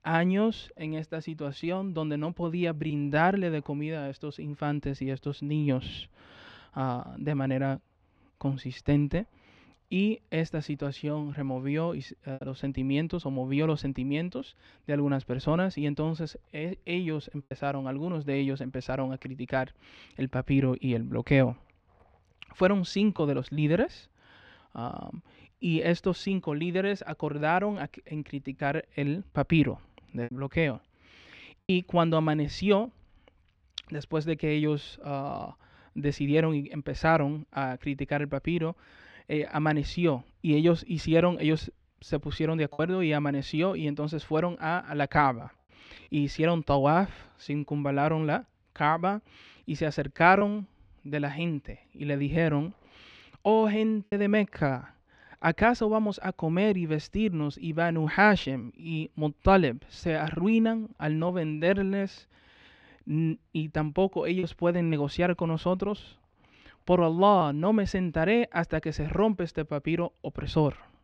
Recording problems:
muffled; slightly; fading above 2.5 kHz
choppy; occasionally; 1% of the speech affected

